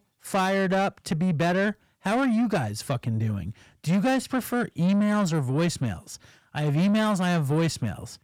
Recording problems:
distortion; slight; 10 dB below the speech

